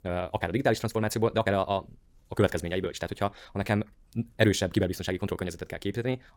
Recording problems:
wrong speed, natural pitch; too fast; 1.6 times normal speed

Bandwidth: 18 kHz